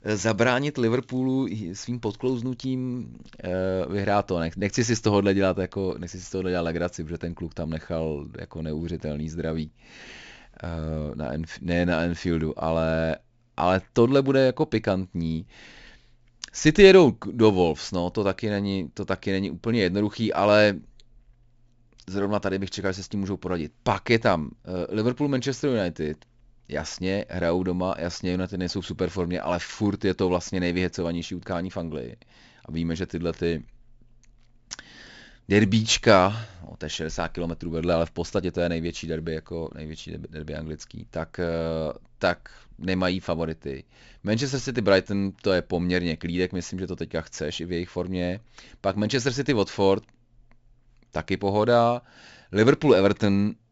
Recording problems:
high frequencies cut off; noticeable; nothing above 8 kHz

